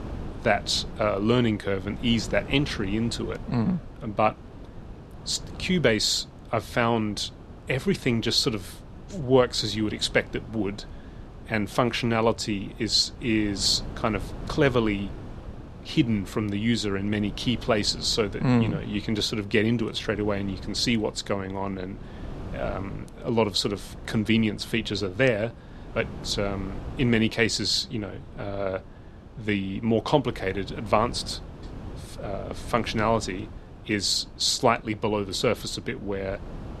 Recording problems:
wind noise on the microphone; occasional gusts; 20 dB below the speech

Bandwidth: 13.5 kHz